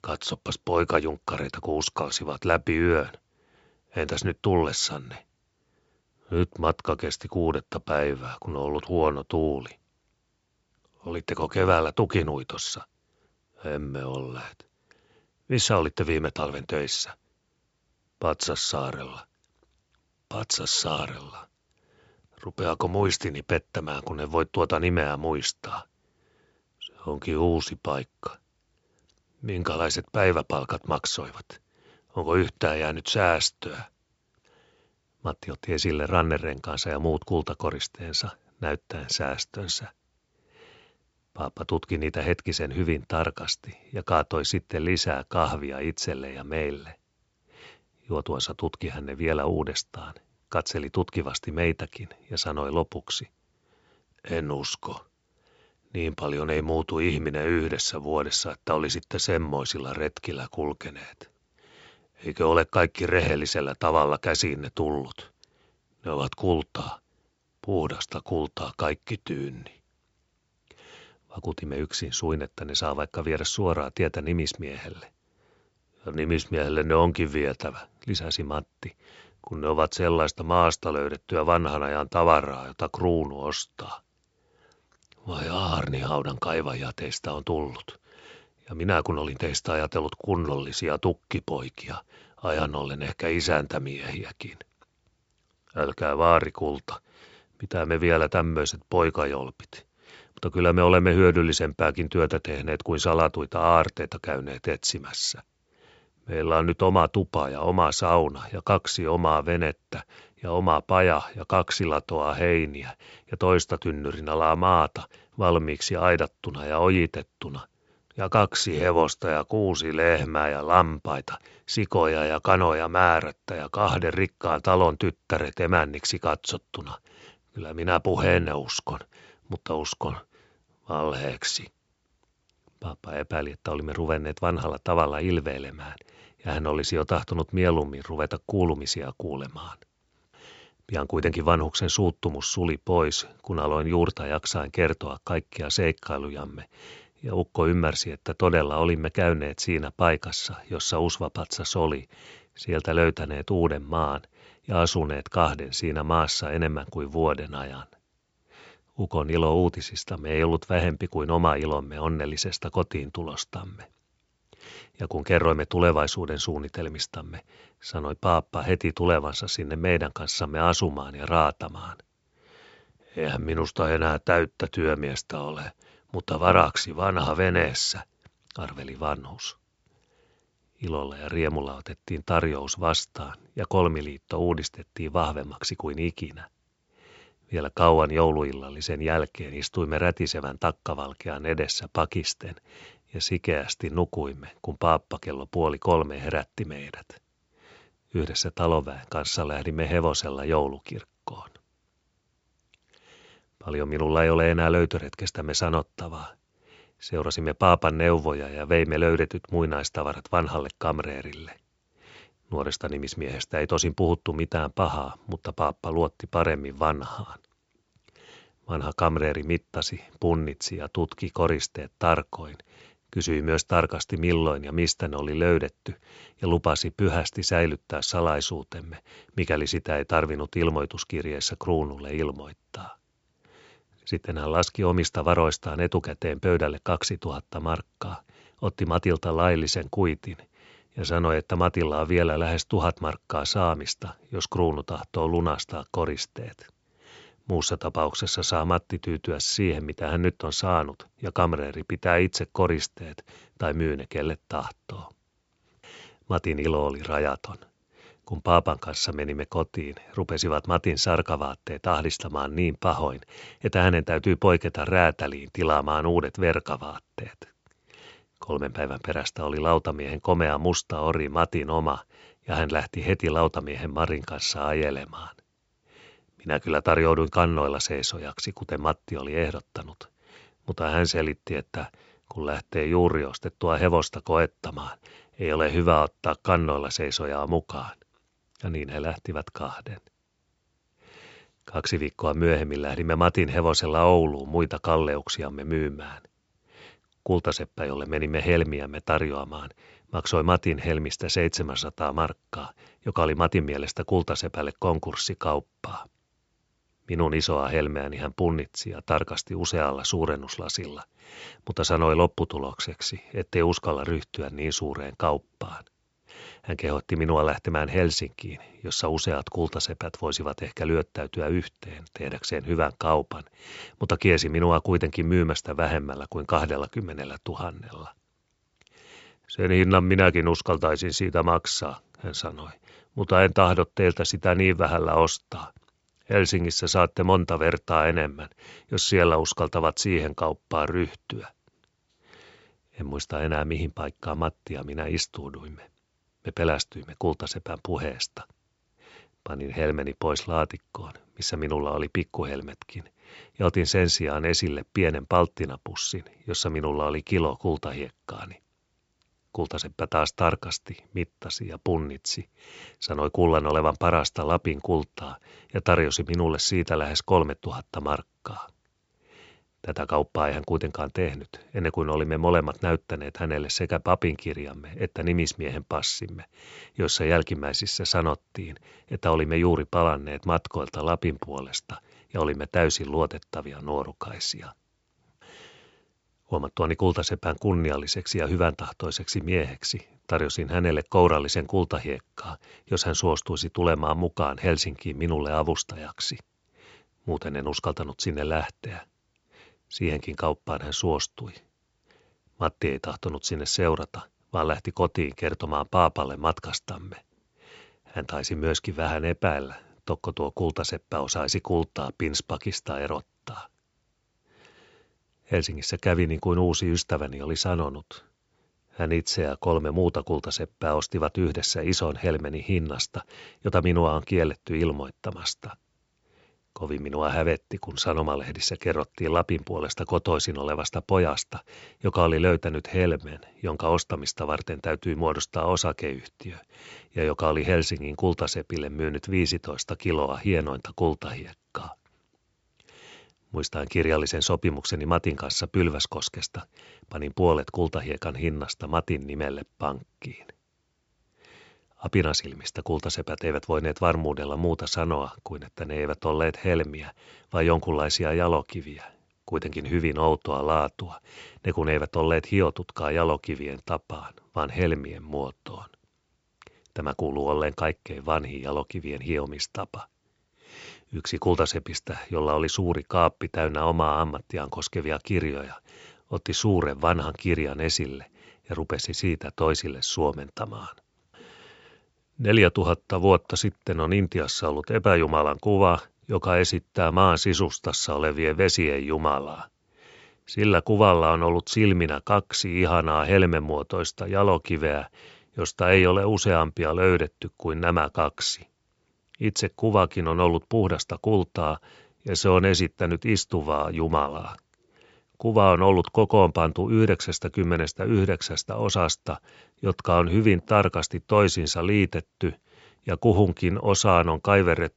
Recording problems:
high frequencies cut off; noticeable; nothing above 8 kHz

